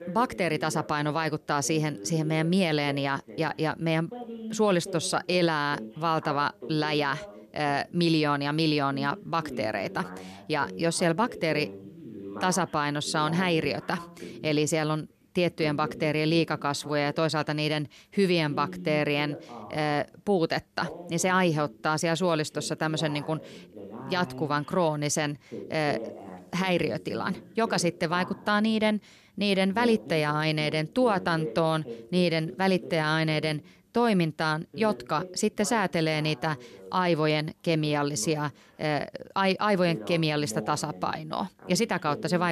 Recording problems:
voice in the background; noticeable; throughout; 15 dB below the speech
abrupt cut into speech; at the end

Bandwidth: 13.5 kHz